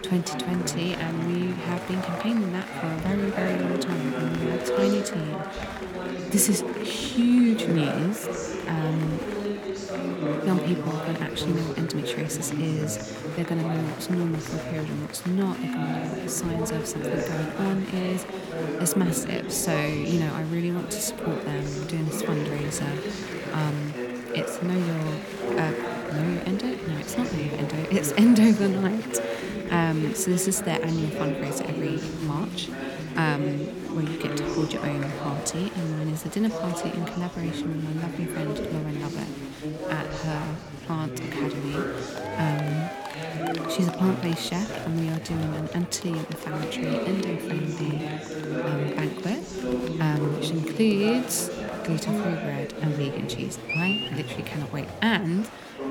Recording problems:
murmuring crowd; loud; throughout; 4 dB below the speech

